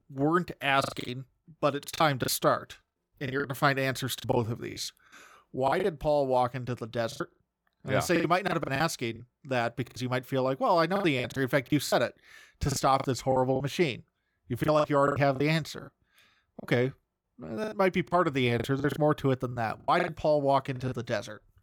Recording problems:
choppy; very; 13% of the speech affected

